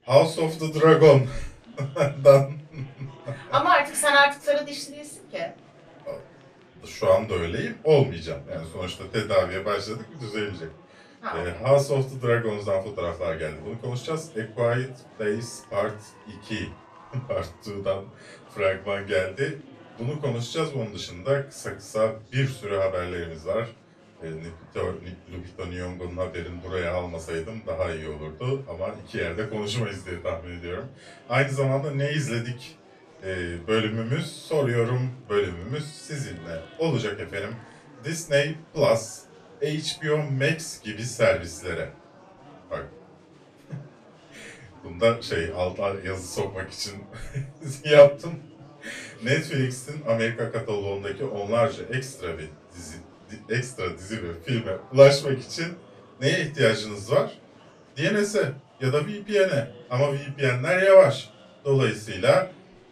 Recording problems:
off-mic speech; far
room echo; very slight; dies away in 0.2 s
murmuring crowd; faint; throughout; 25 dB below the speech

